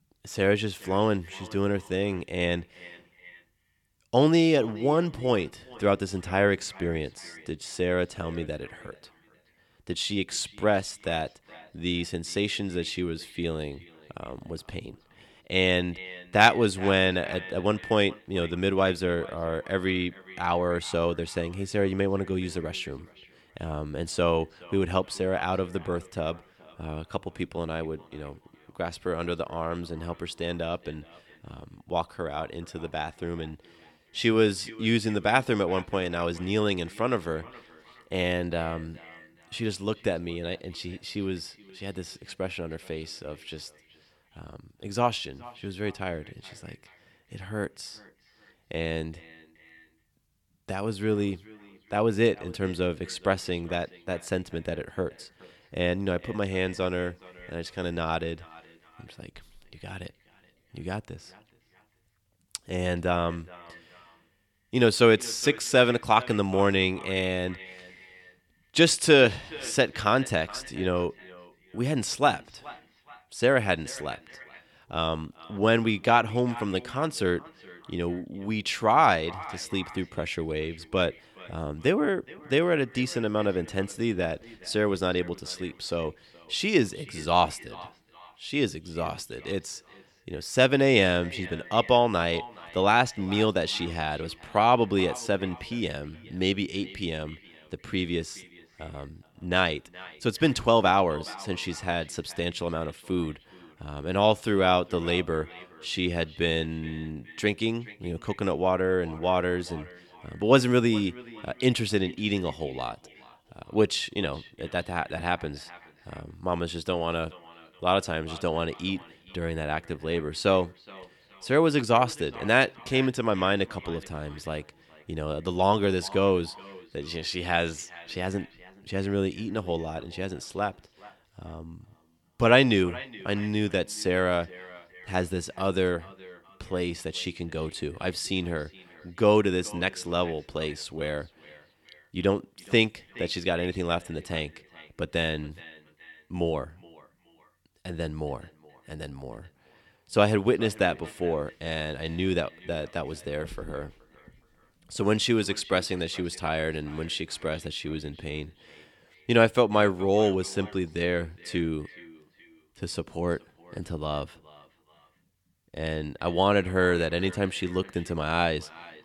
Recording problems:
echo of what is said; faint; throughout; 420 ms later, 20 dB below the speech

